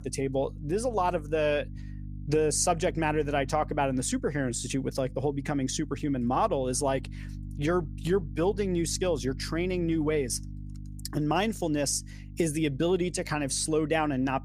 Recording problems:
electrical hum; faint; throughout; 50 Hz, 25 dB below the speech

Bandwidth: 15 kHz